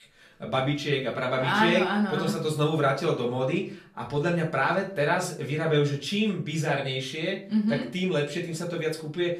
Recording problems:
off-mic speech; far
room echo; slight; dies away in 0.4 s

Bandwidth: 14.5 kHz